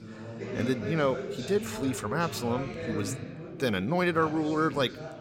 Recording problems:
background chatter; loud; throughout; 4 voices, 8 dB below the speech

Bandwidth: 16 kHz